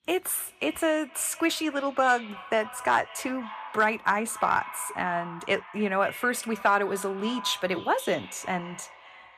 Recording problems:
echo of what is said; noticeable; throughout; 260 ms later, 15 dB below the speech

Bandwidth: 14.5 kHz